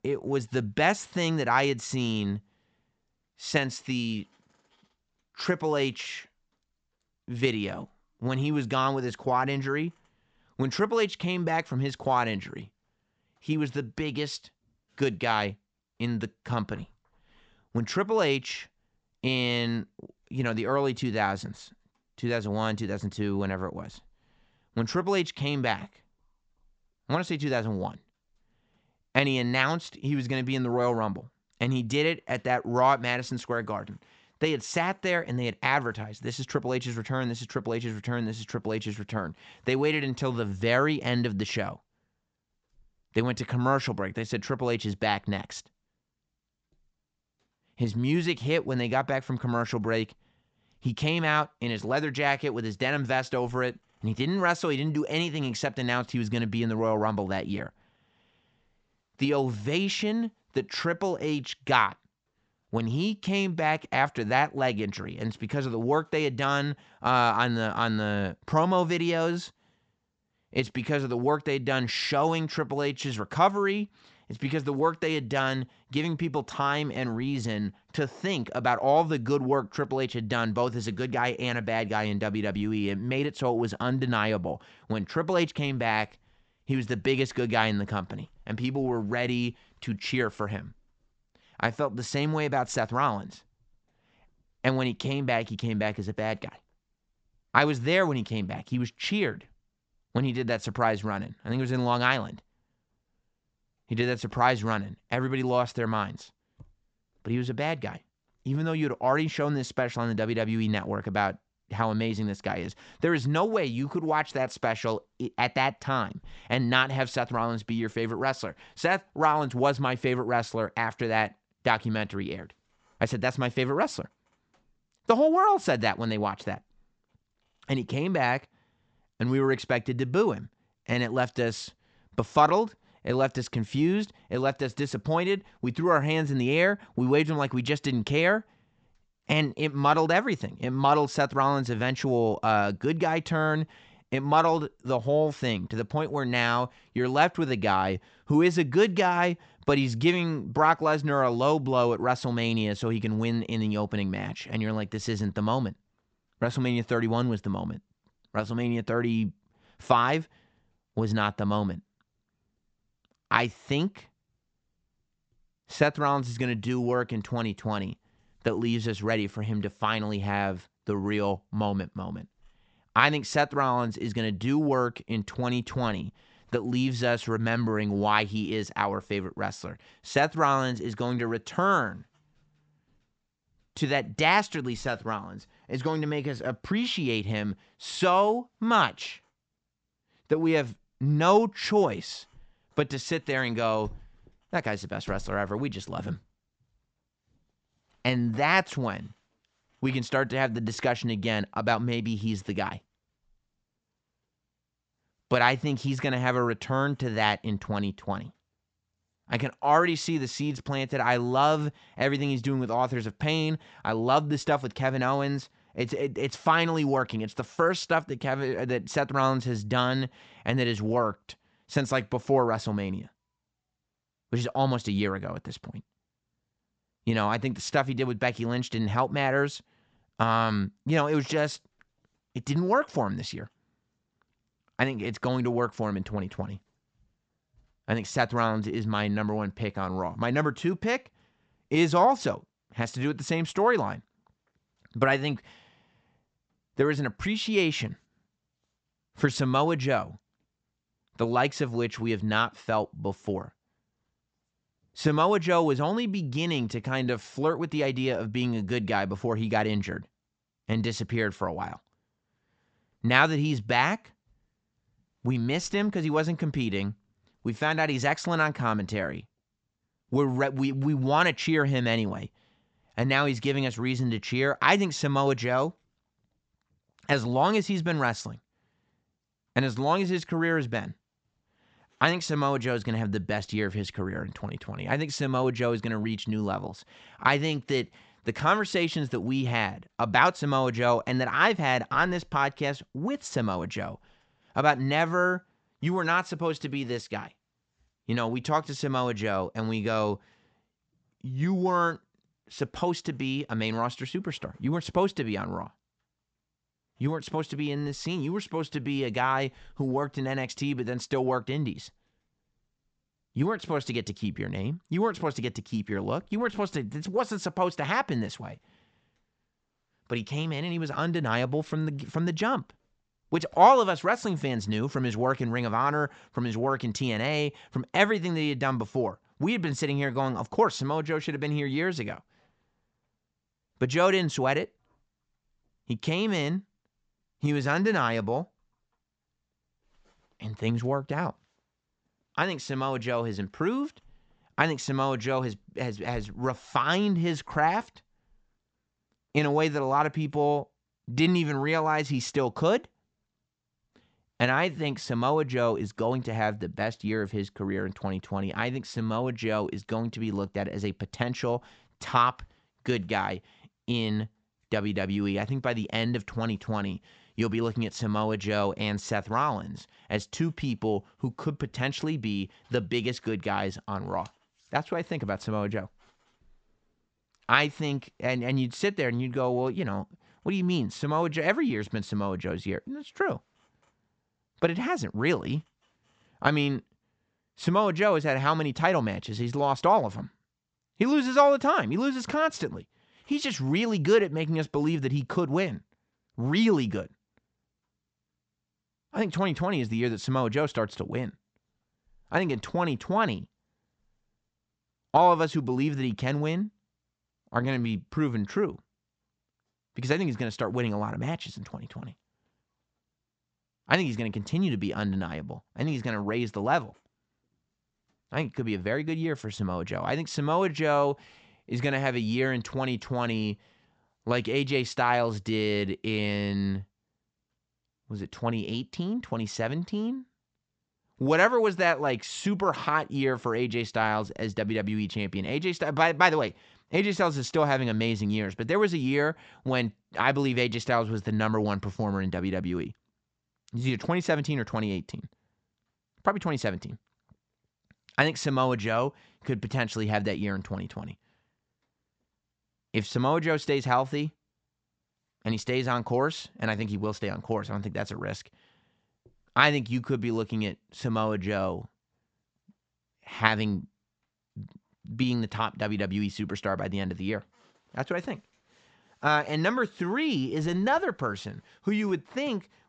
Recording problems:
high frequencies cut off; noticeable; nothing above 8 kHz

